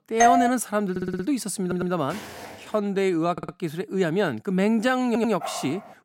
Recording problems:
doorbell; loud; at the start; peak 5 dB above the speech
audio stuttering; 4 times, first at 1 s
footsteps; faint; at 2 s; peak 15 dB below the speech
dog barking; noticeable; at 5.5 s; peak 9 dB below the speech

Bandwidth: 16.5 kHz